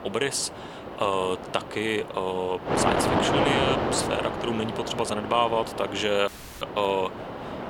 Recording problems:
thin; somewhat; fading below 600 Hz
wind noise on the microphone; heavy; 2 dB below the speech
audio cutting out; at 6.5 s

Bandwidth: 18 kHz